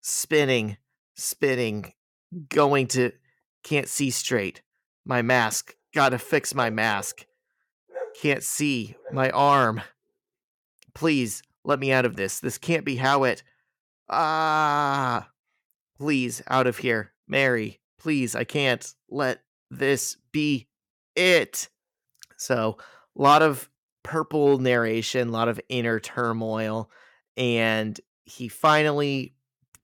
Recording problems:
none

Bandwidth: 17.5 kHz